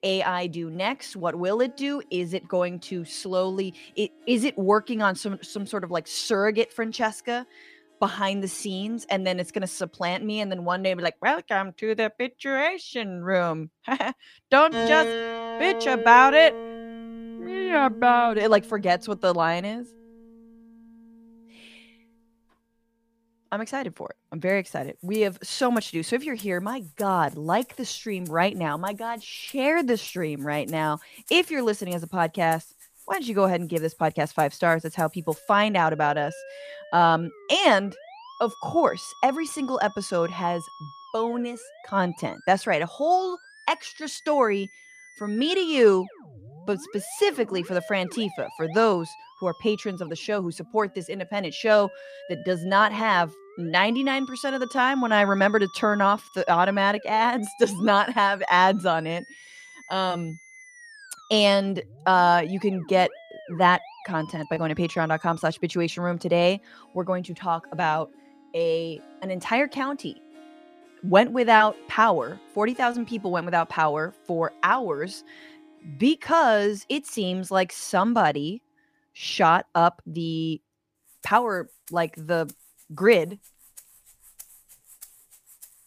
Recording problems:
background music; noticeable; throughout; 15 dB below the speech

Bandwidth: 15 kHz